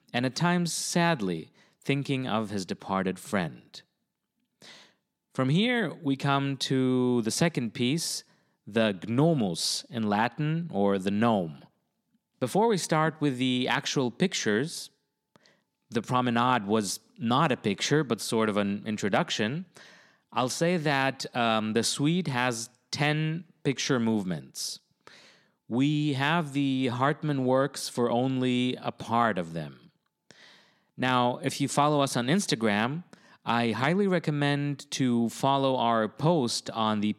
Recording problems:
none

